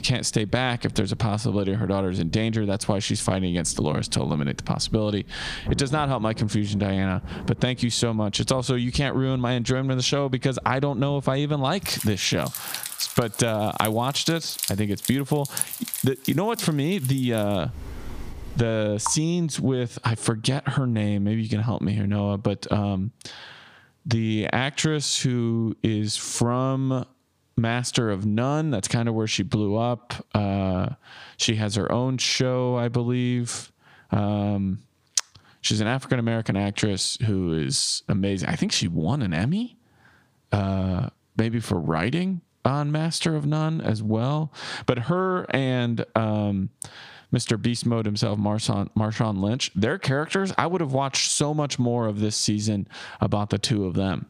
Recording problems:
squashed, flat; somewhat, background pumping
rain or running water; noticeable; until 19 s; 10 dB below the speech

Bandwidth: 15 kHz